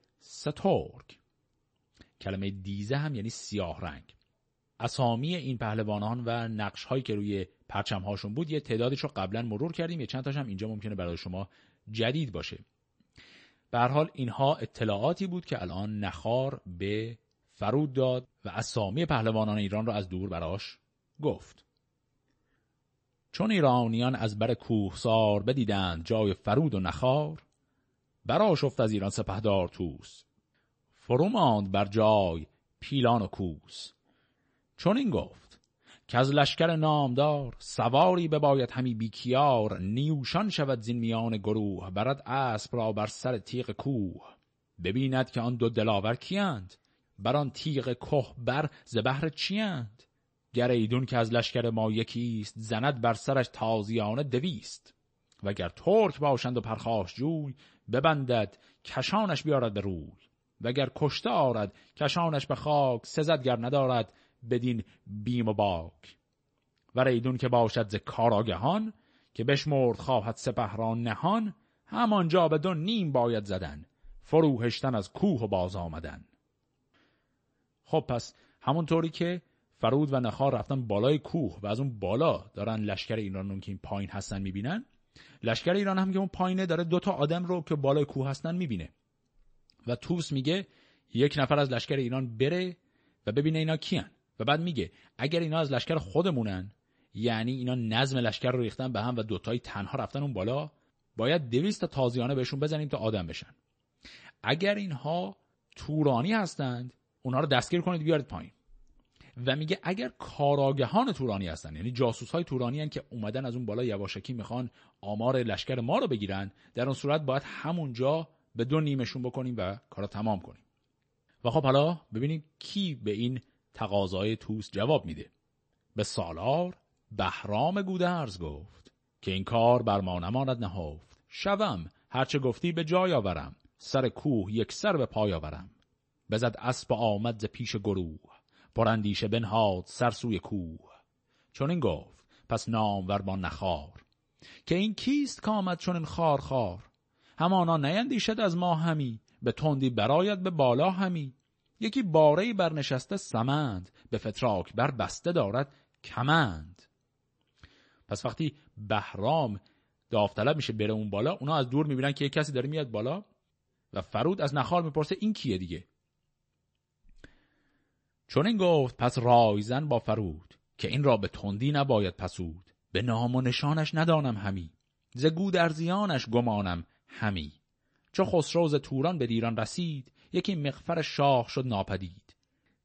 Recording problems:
garbled, watery; slightly; nothing above 8 kHz

